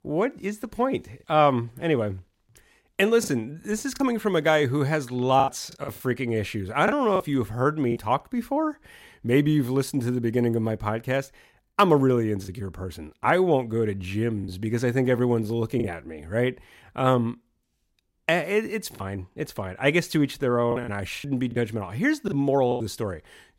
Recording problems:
choppy; occasionally; 4% of the speech affected

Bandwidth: 16 kHz